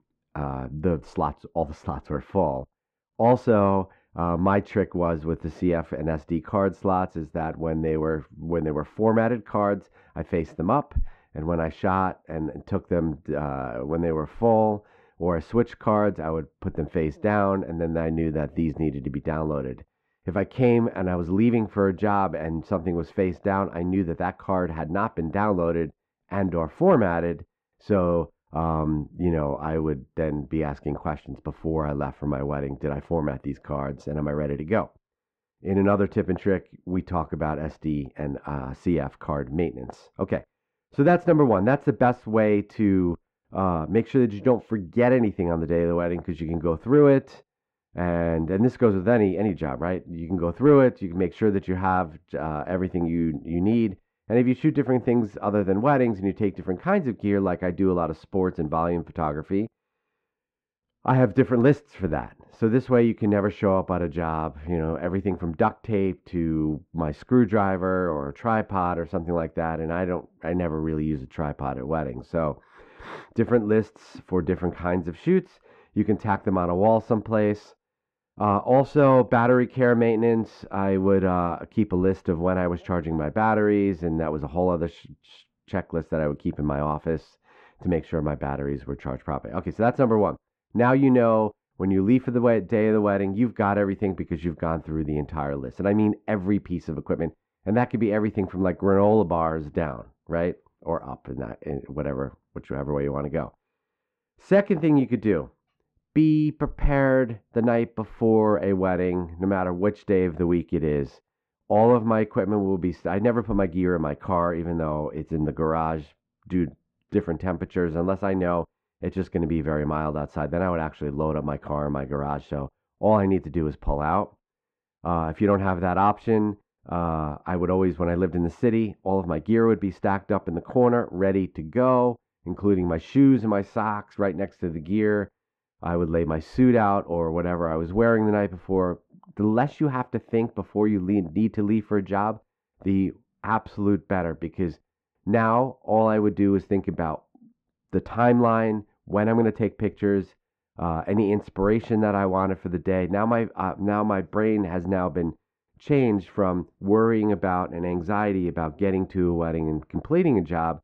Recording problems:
muffled; very; fading above 1.5 kHz

